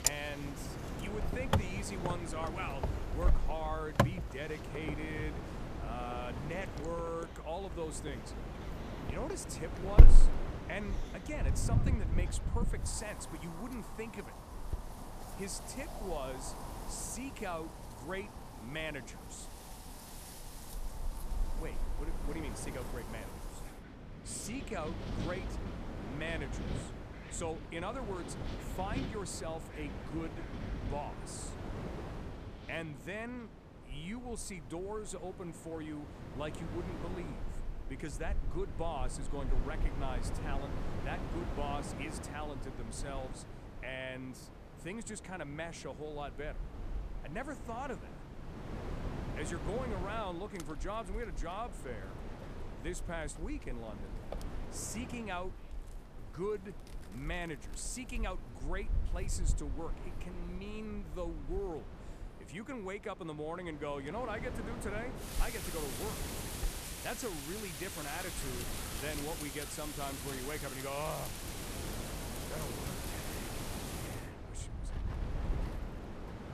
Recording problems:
wind in the background; very loud; throughout; 3 dB above the speech

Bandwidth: 14.5 kHz